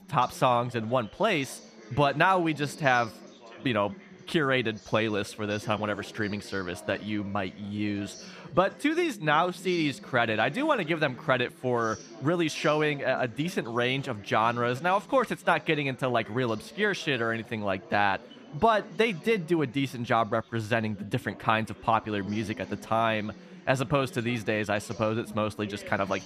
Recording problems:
chatter from many people; noticeable; throughout; 20 dB below the speech

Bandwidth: 14.5 kHz